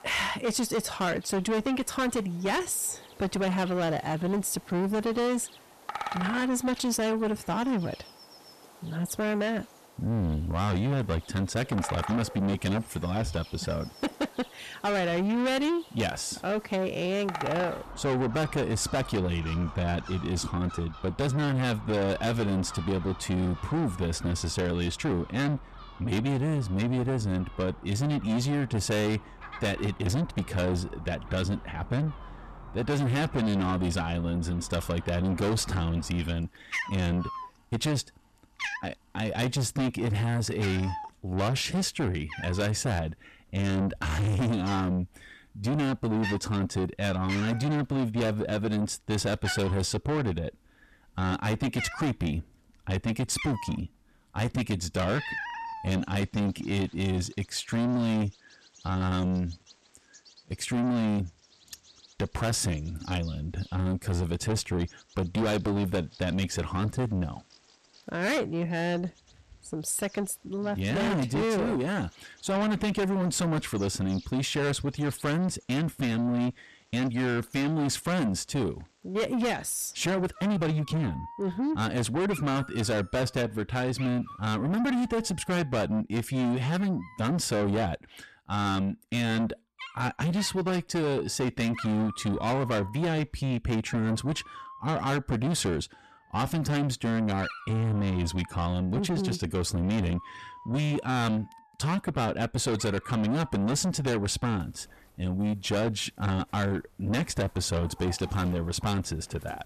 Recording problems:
distortion; heavy; 6 dB below the speech
animal sounds; noticeable; throughout; 15 dB below the speech
uneven, jittery; strongly; from 3.5 s to 1:21

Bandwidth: 14 kHz